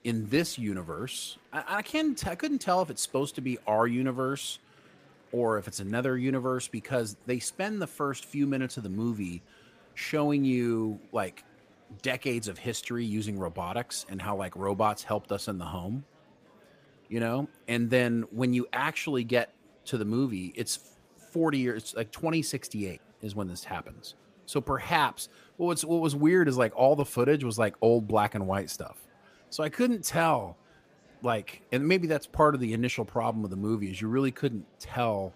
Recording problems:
murmuring crowd; faint; throughout; 30 dB below the speech

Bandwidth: 15 kHz